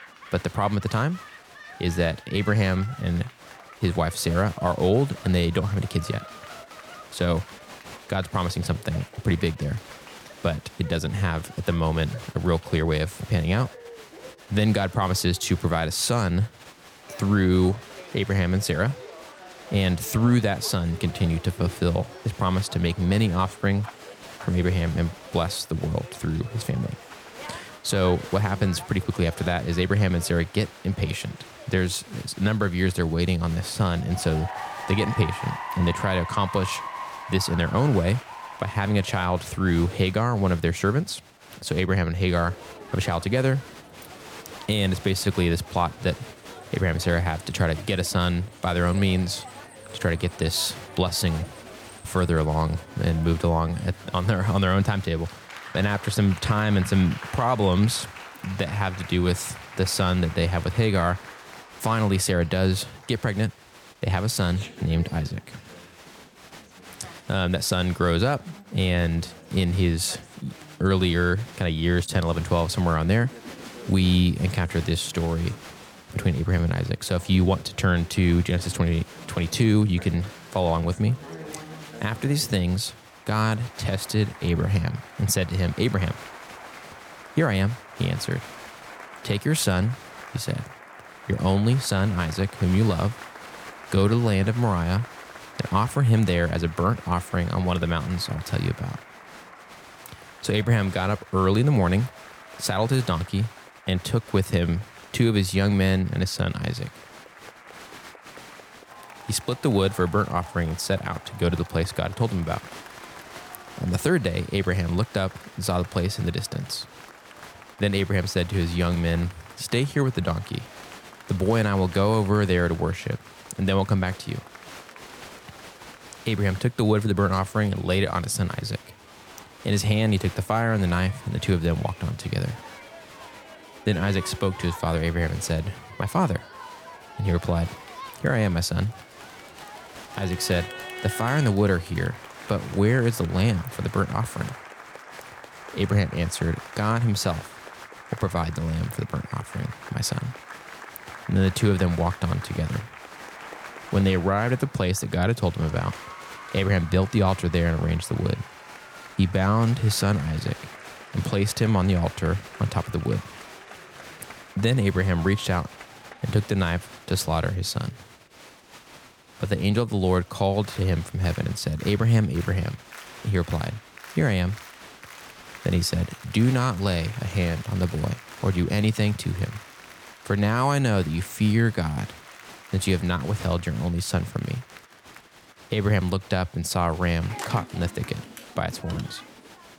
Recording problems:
crowd noise; noticeable; throughout; 15 dB below the speech

